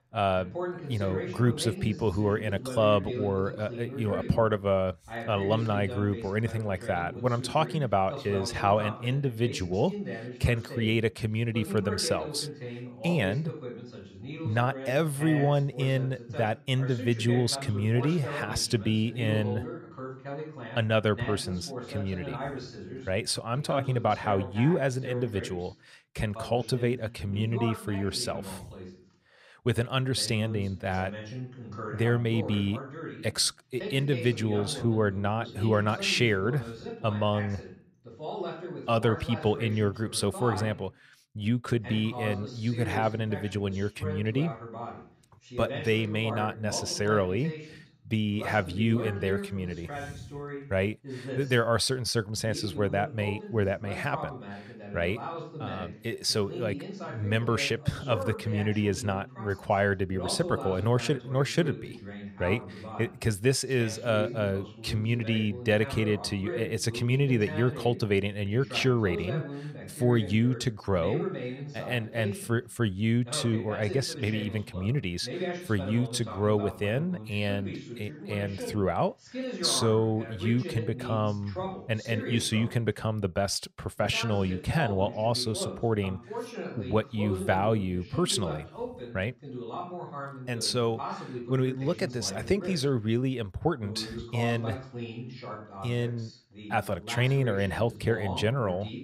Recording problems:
voice in the background; noticeable; throughout; 10 dB below the speech

